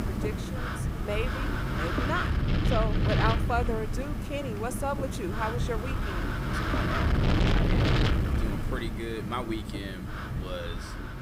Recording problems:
wind noise on the microphone; heavy; as loud as the speech

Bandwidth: 15.5 kHz